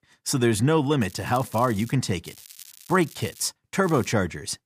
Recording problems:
crackling; faint; at 1 s, from 2 to 3.5 s and at 4 s; 20 dB below the speech

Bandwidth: 15 kHz